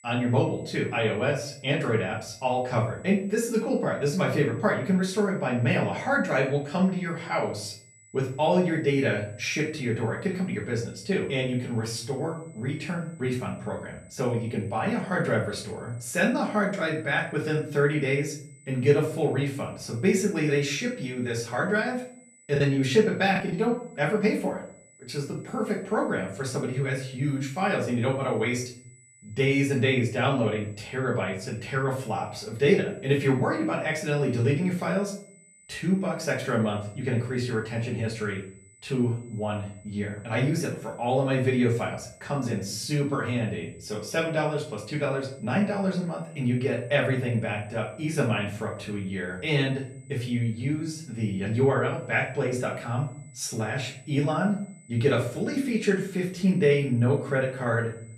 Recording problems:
off-mic speech; far
room echo; slight; dies away in 0.4 s
high-pitched whine; faint; throughout; 8 kHz, 25 dB below the speech
choppy; very; at 23 s; 8% of the speech affected

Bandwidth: 14 kHz